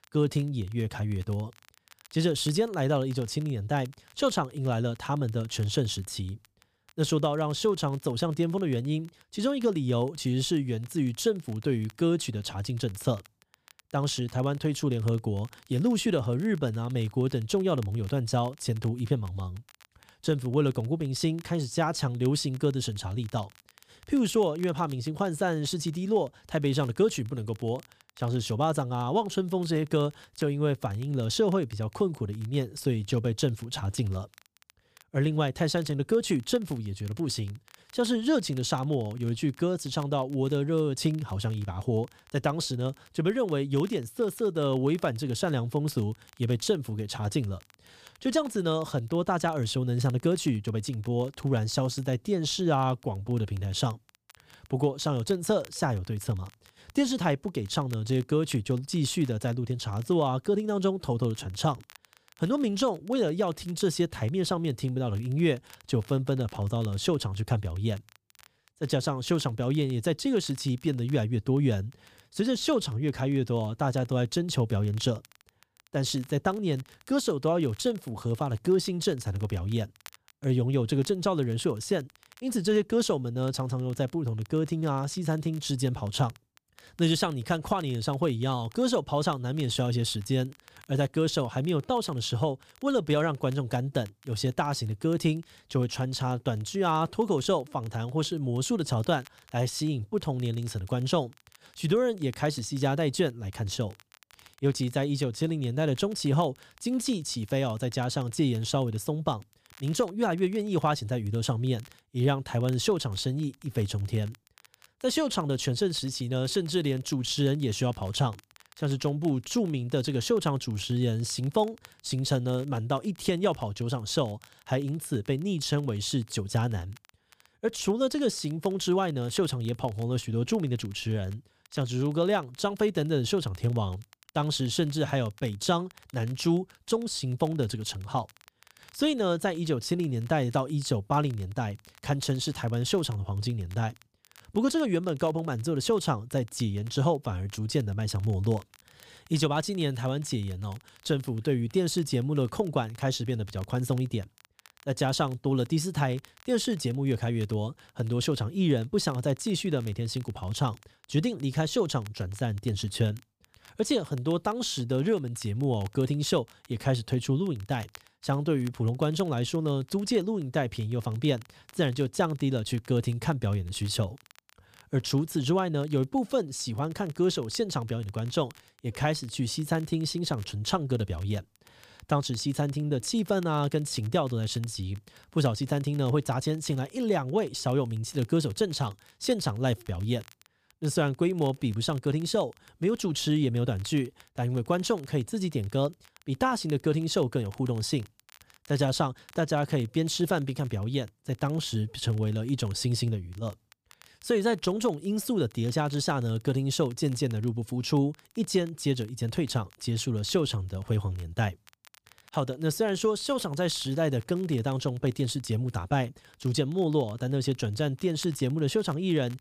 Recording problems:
crackle, like an old record; faint; 30 dB below the speech

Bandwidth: 15 kHz